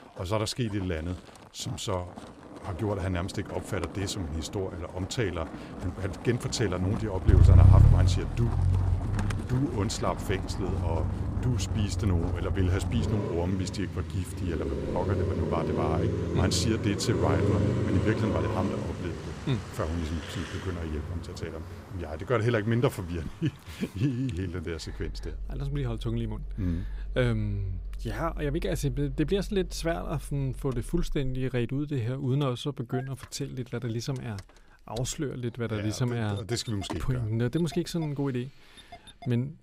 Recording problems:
traffic noise; very loud; throughout; 2 dB above the speech

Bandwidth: 15.5 kHz